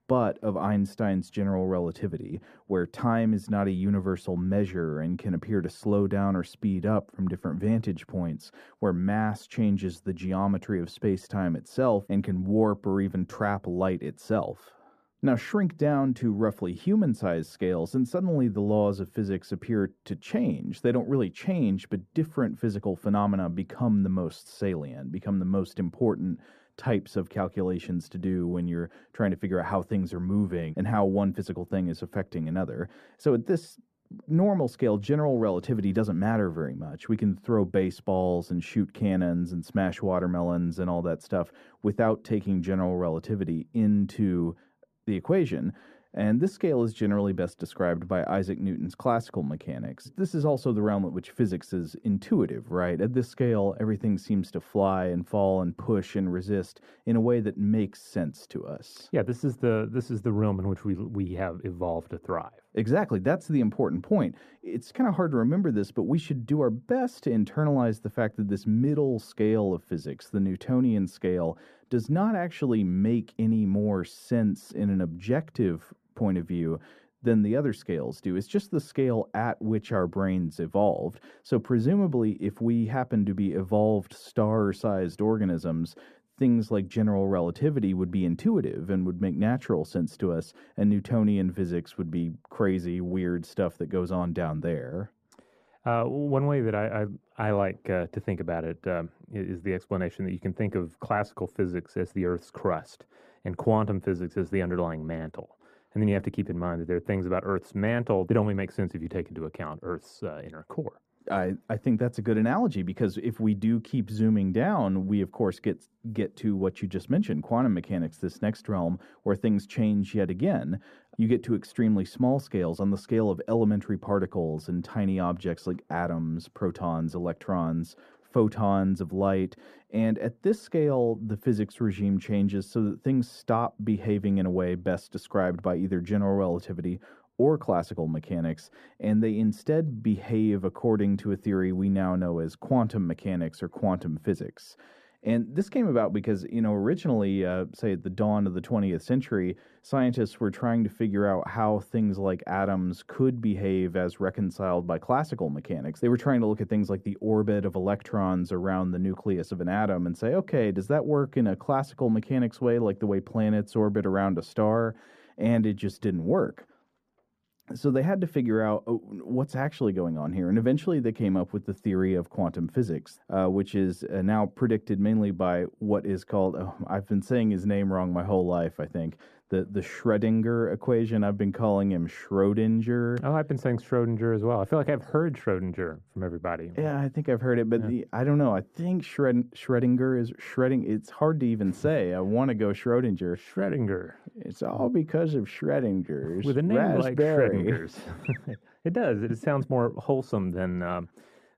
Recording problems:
muffled; slightly; fading above 1.5 kHz

